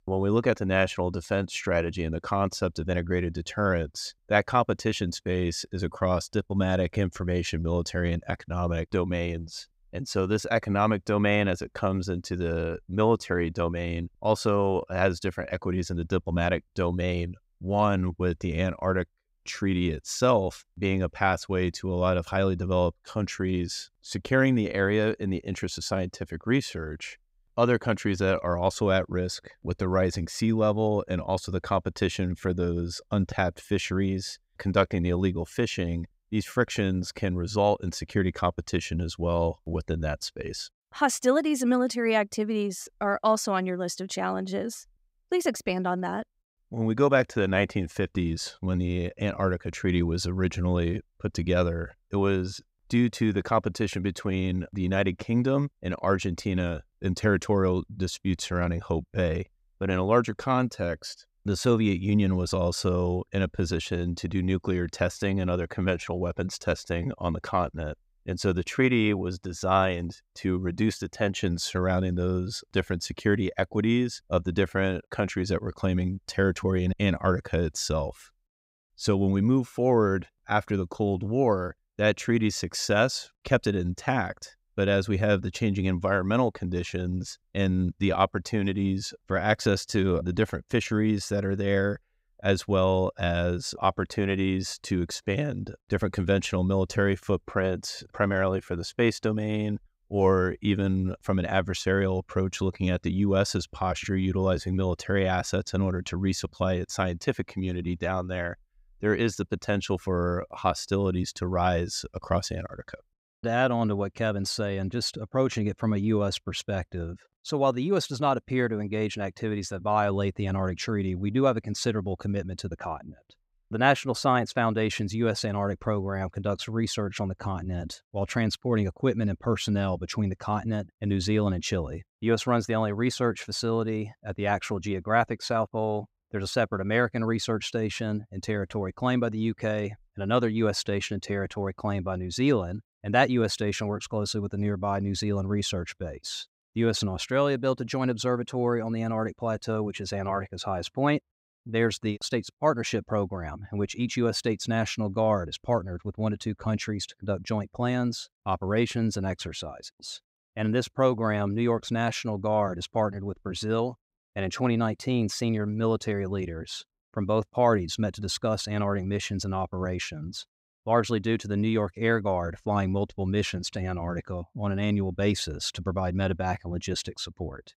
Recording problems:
none

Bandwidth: 15.5 kHz